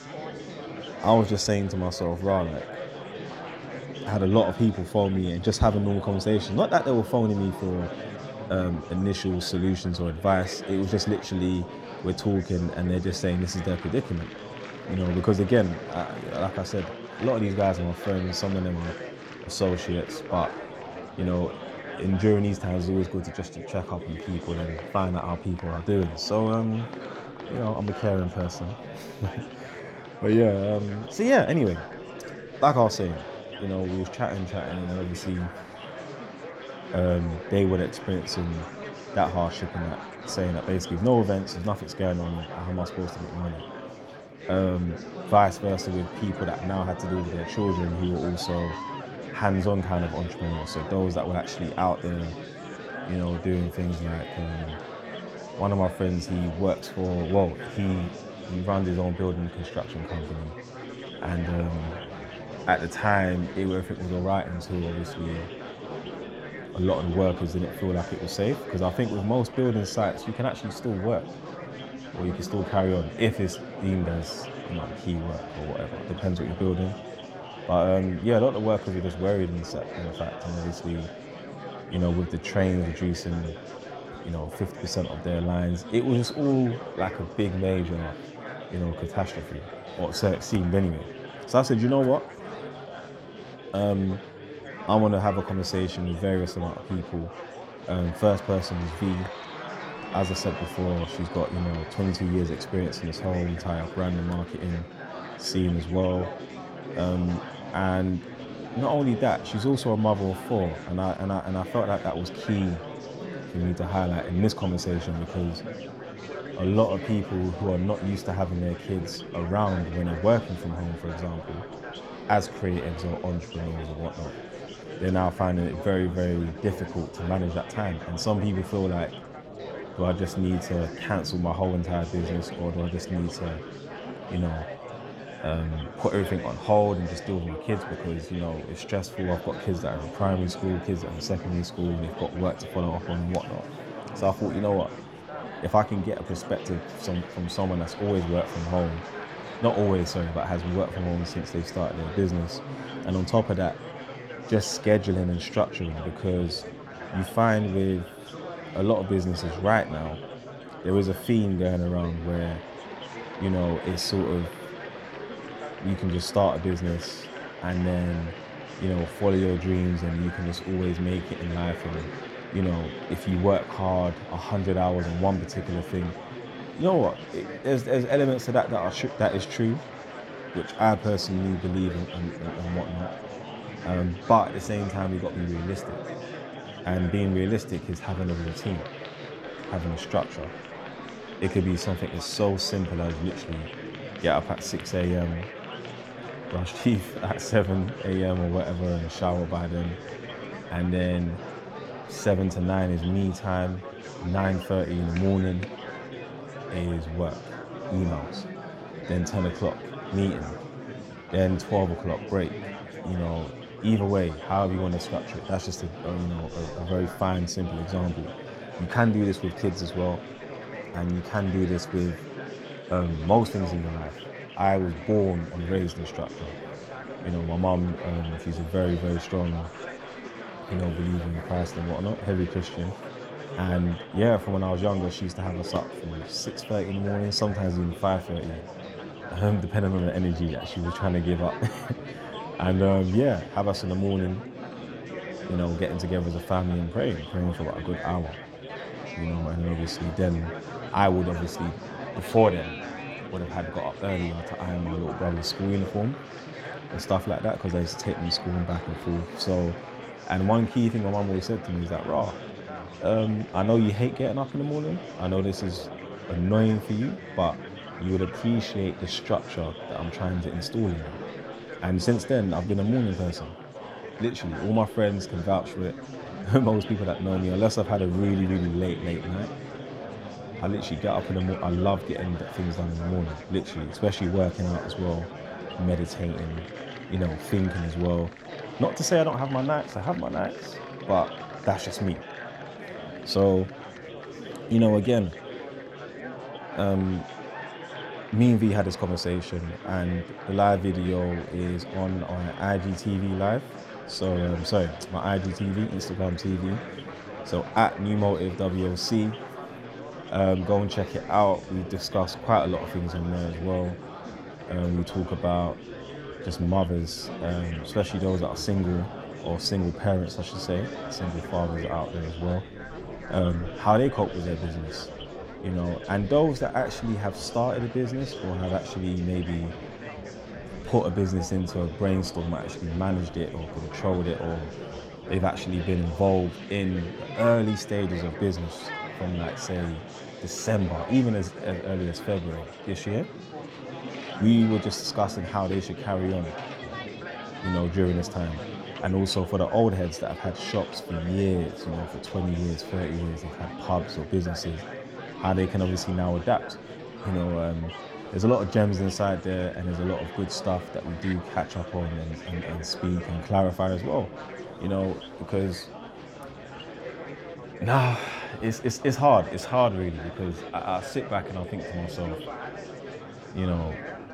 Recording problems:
murmuring crowd; noticeable; throughout; 10 dB below the speech

